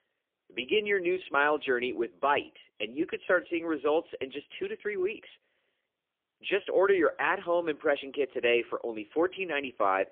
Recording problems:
phone-call audio; poor line; nothing above 3.5 kHz

